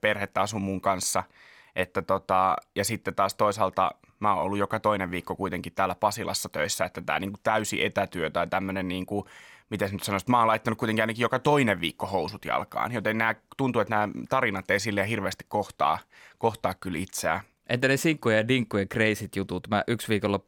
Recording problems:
none

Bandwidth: 17 kHz